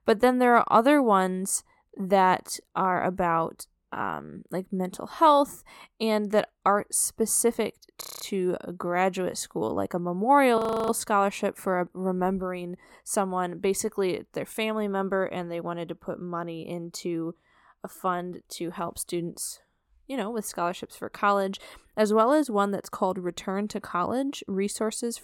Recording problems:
audio freezing; at 8 s and at 11 s

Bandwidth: 17.5 kHz